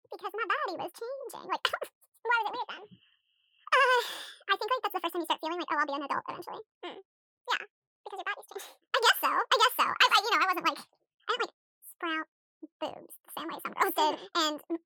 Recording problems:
wrong speed and pitch; too fast and too high; 1.7 times normal speed

